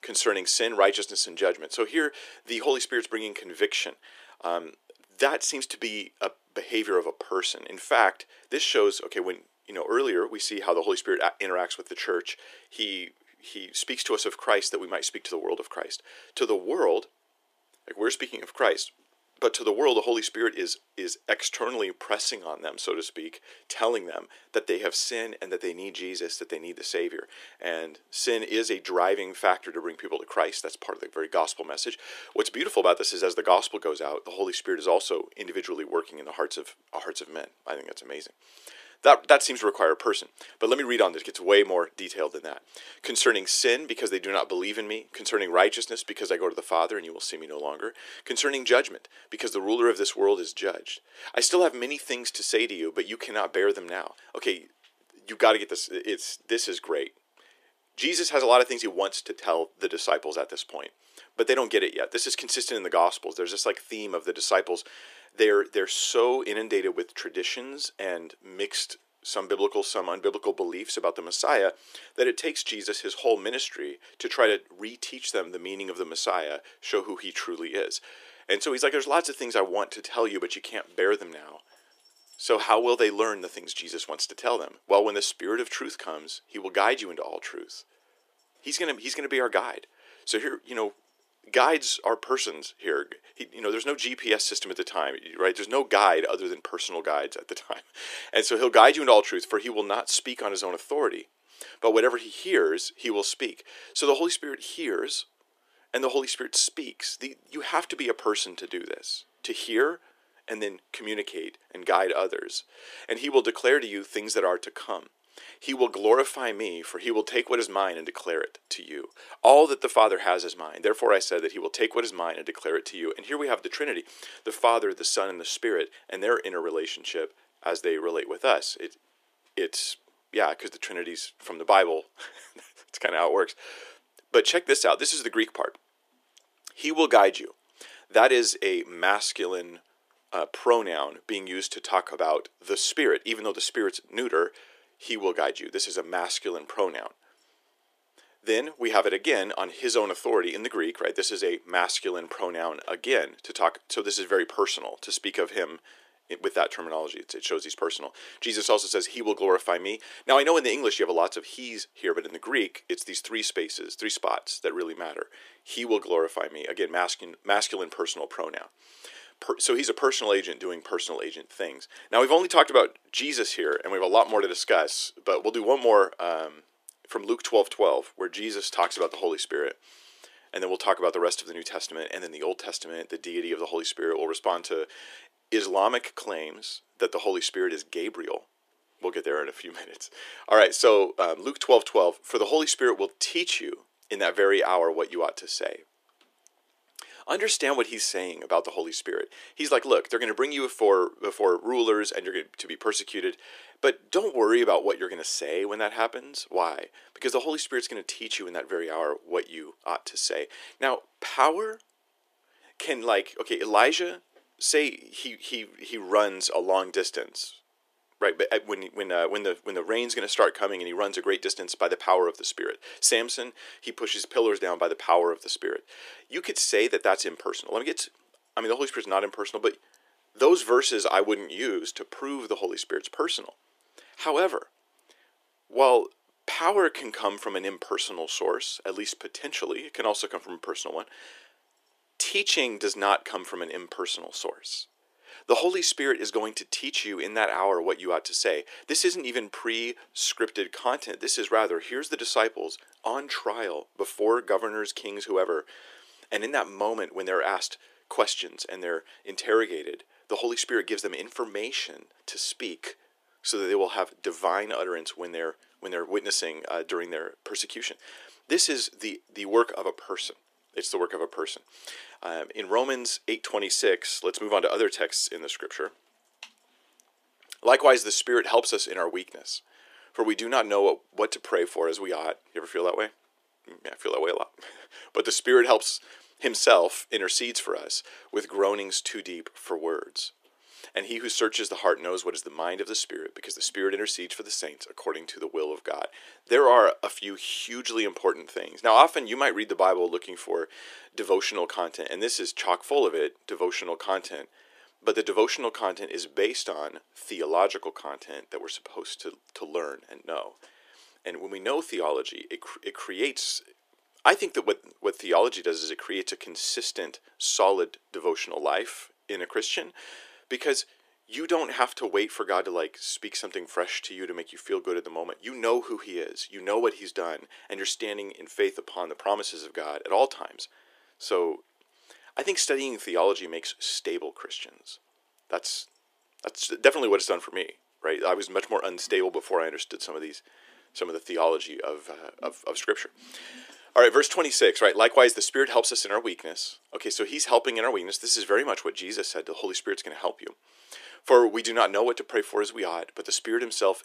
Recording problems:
thin; very; fading below 350 Hz

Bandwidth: 14.5 kHz